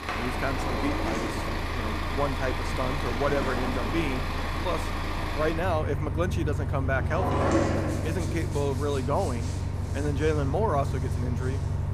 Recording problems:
traffic noise; very loud; throughout; 1 dB above the speech
household noises; loud; throughout; 2 dB below the speech

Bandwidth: 15 kHz